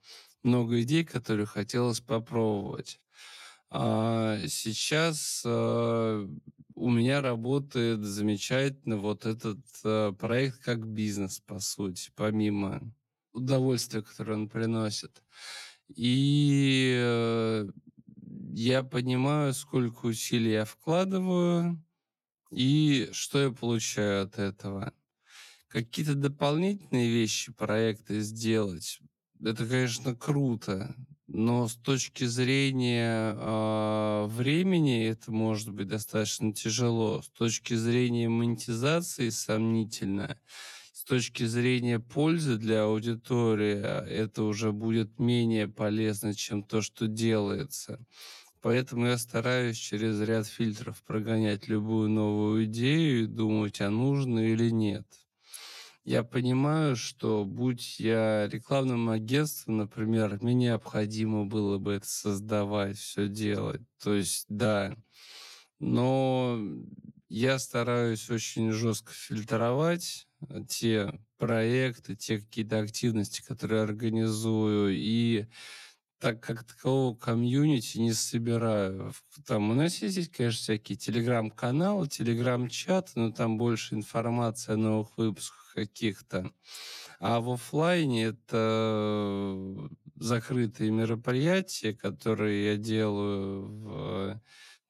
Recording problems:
wrong speed, natural pitch; too slow; 0.6 times normal speed

